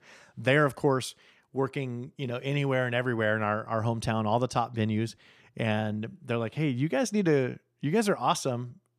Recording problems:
none

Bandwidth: 14.5 kHz